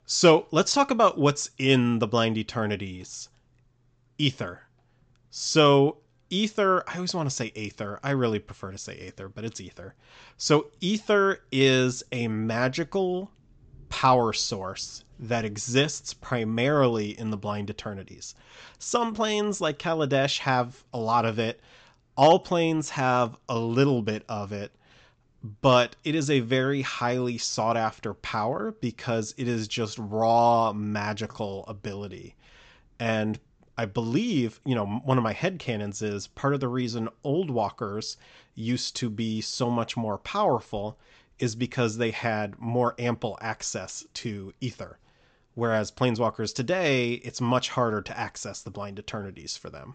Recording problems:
high frequencies cut off; noticeable; nothing above 8 kHz

